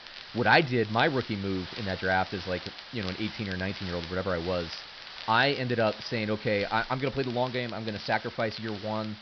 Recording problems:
high frequencies cut off; noticeable; nothing above 5.5 kHz
hiss; noticeable; throughout; 15 dB below the speech
crackle, like an old record; noticeable; 20 dB below the speech

